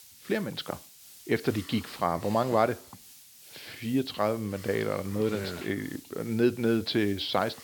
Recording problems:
high frequencies cut off; noticeable; nothing above 5.5 kHz
hiss; noticeable; throughout; 20 dB below the speech

